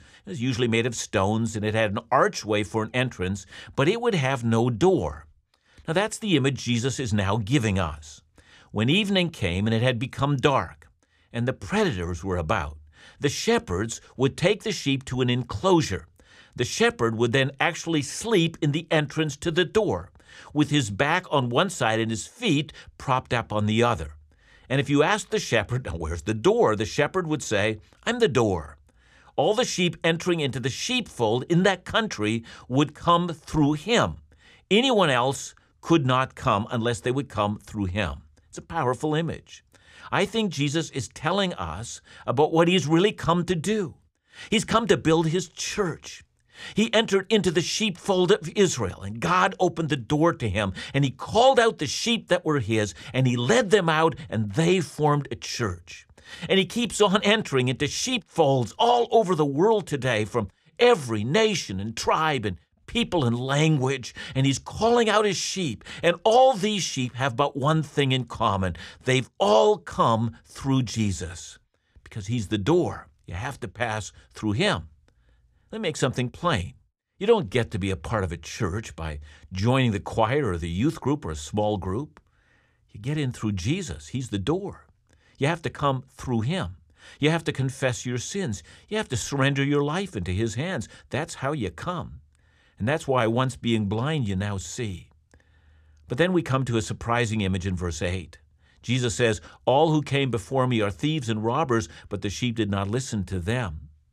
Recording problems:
none

